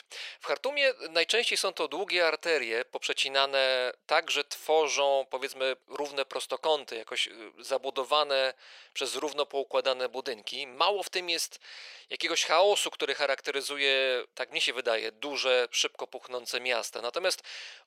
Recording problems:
thin; very; fading below 500 Hz

